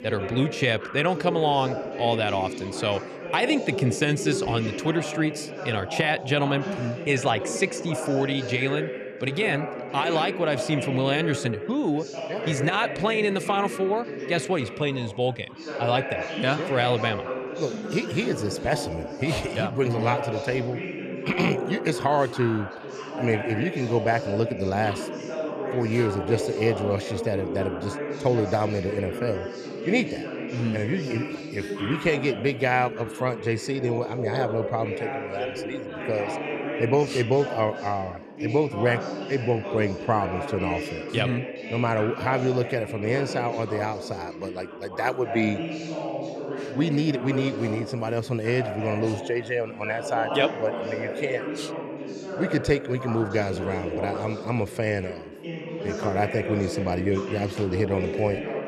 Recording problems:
background chatter; loud; throughout; 4 voices, 6 dB below the speech

